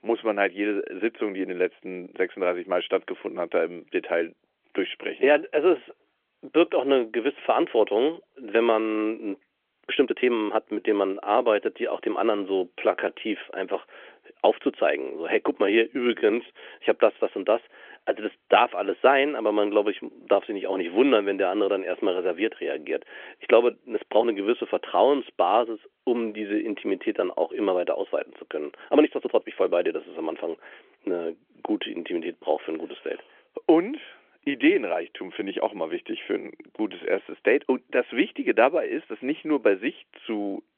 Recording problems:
phone-call audio; nothing above 3.5 kHz
uneven, jittery; strongly; from 10 to 37 s

